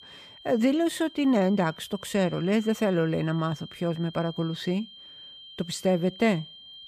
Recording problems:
high-pitched whine; noticeable; throughout; 3 kHz, 20 dB below the speech

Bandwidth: 15 kHz